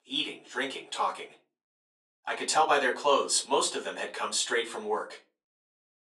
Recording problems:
off-mic speech; far
thin; very; fading below 400 Hz
room echo; very slight; dies away in 0.3 s

